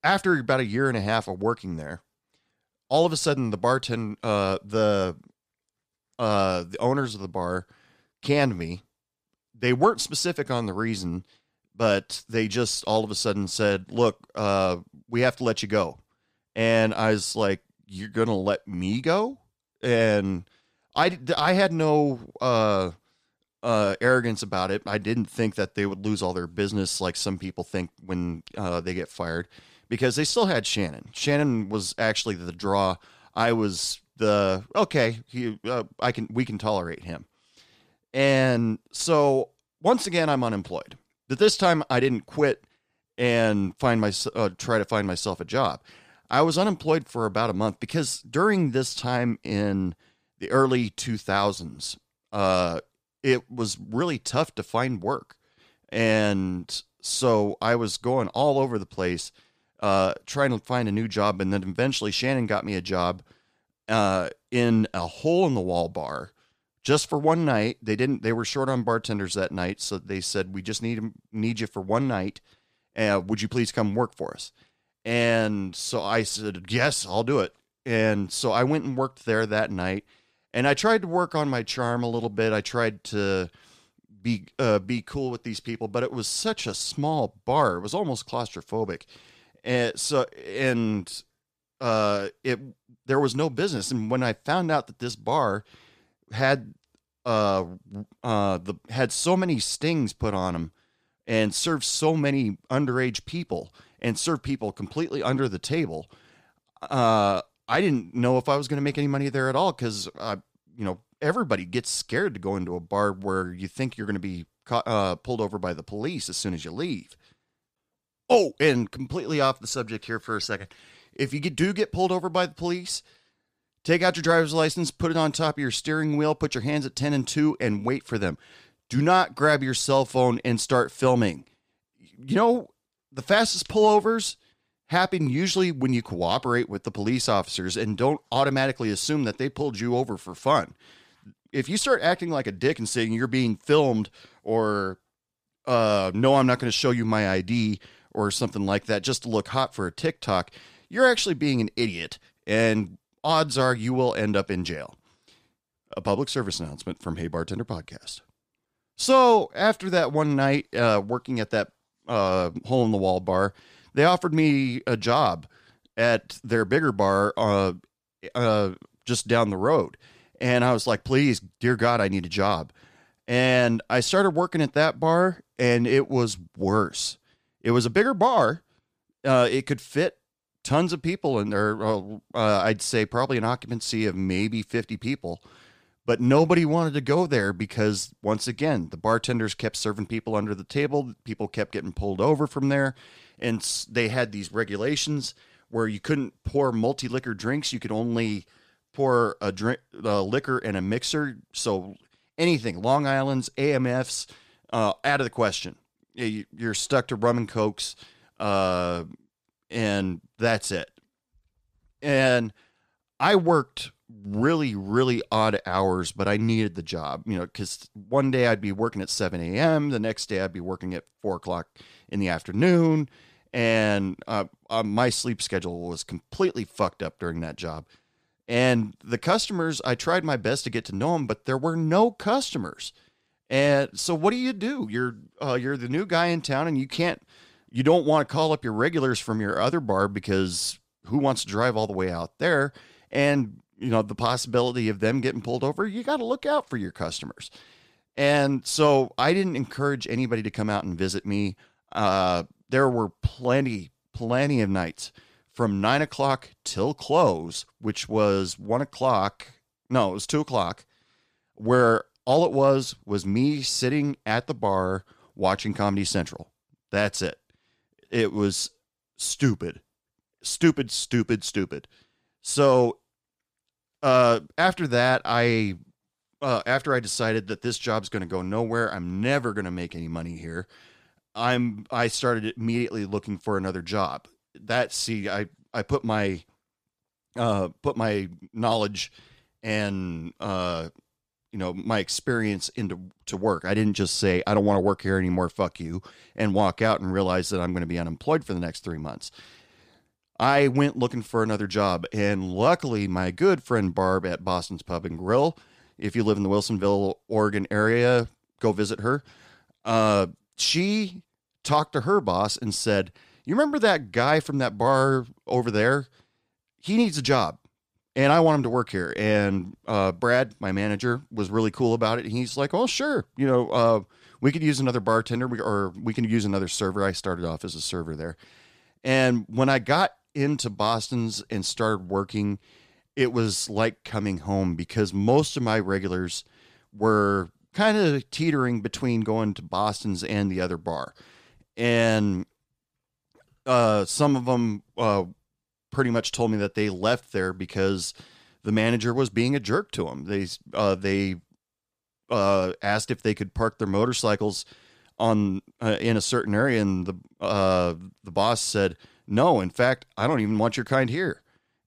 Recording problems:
none

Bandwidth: 14.5 kHz